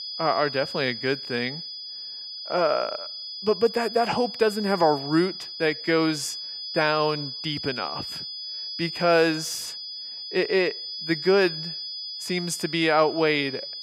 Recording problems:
high-pitched whine; loud; throughout; 5 kHz, 8 dB below the speech

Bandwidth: 15.5 kHz